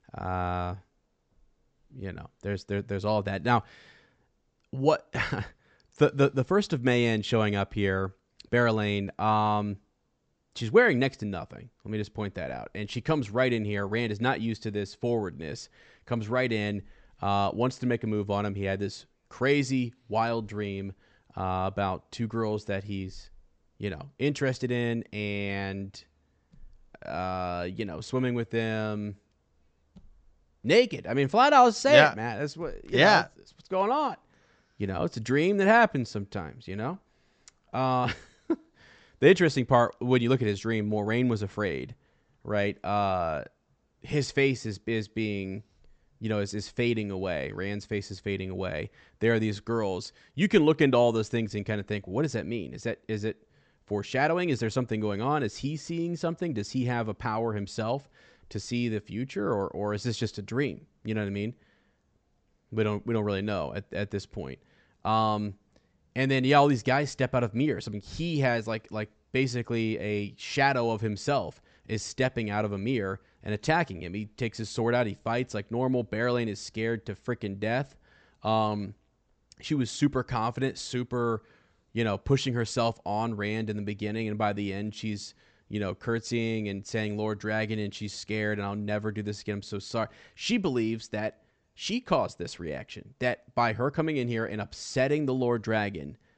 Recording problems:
high frequencies cut off; noticeable; nothing above 8 kHz

